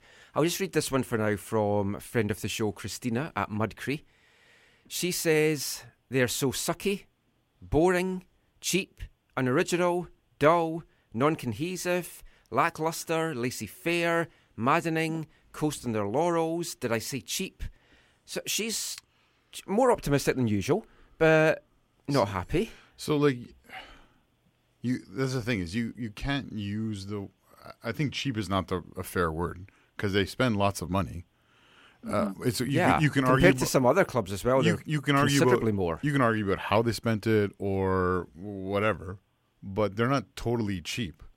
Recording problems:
none

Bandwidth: 16 kHz